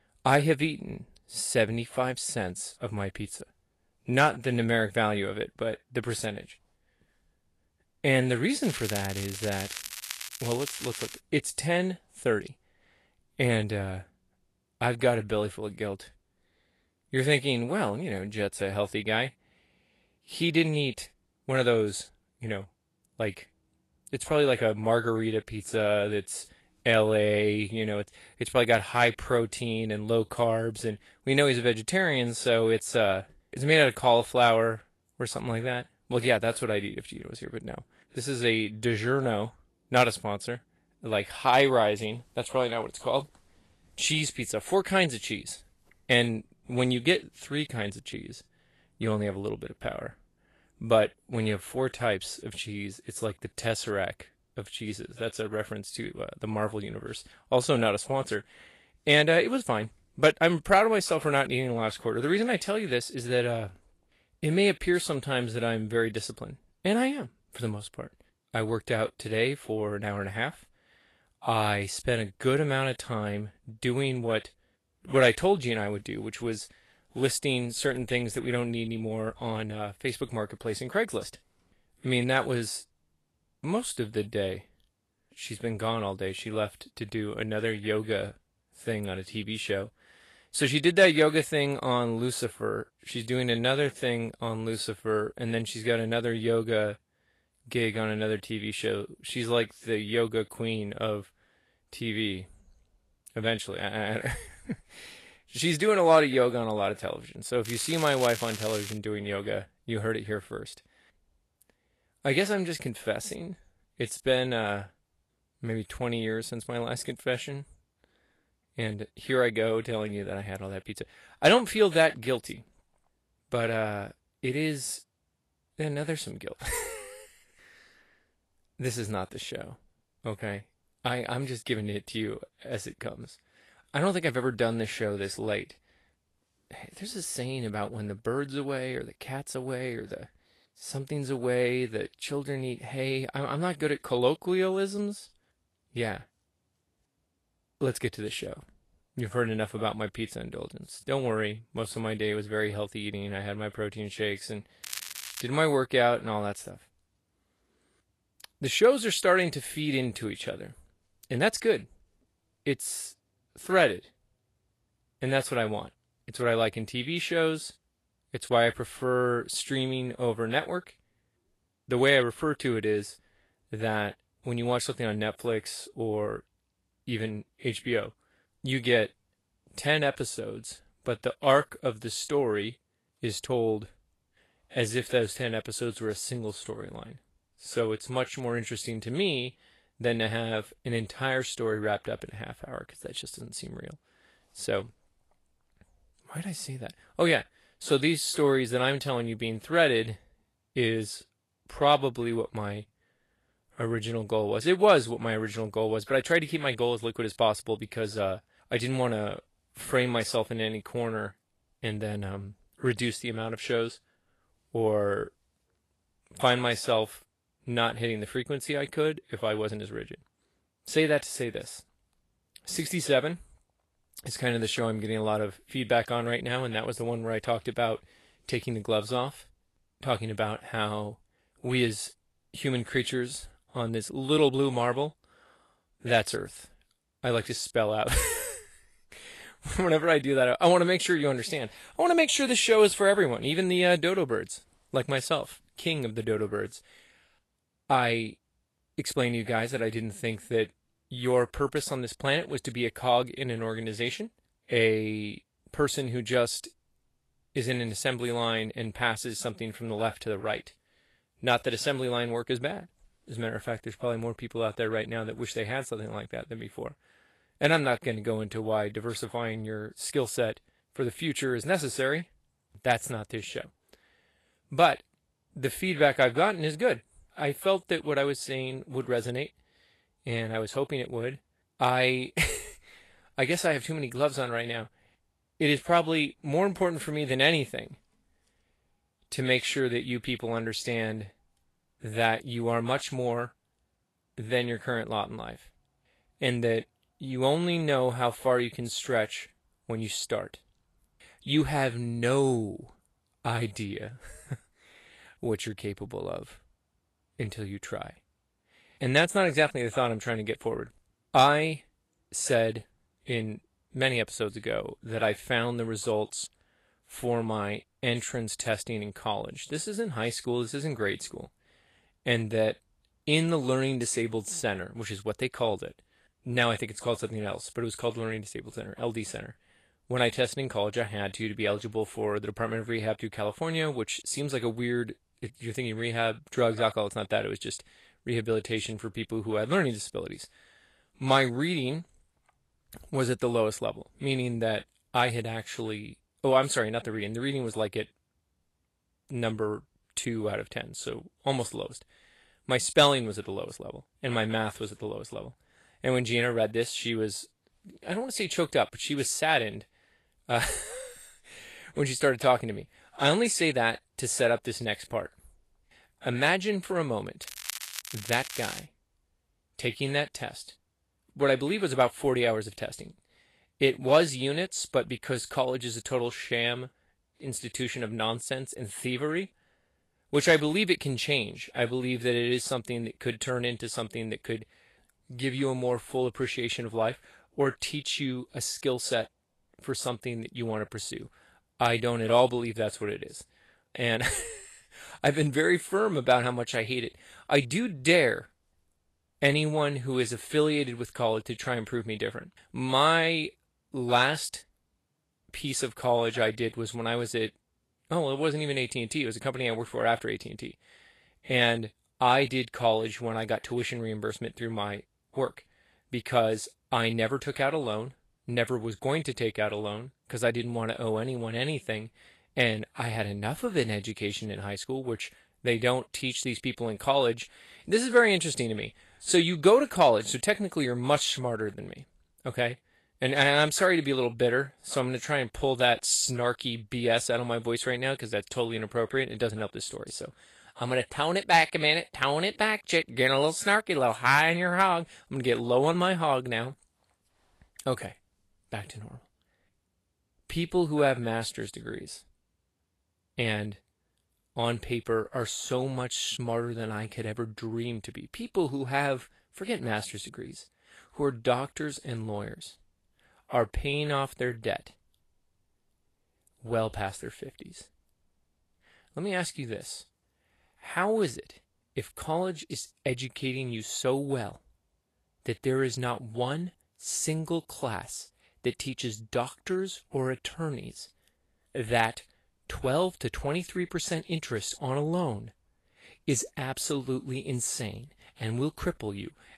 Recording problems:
garbled, watery; slightly; nothing above 12 kHz
crackling; loud; 4 times, first at 8.5 s; 9 dB below the speech

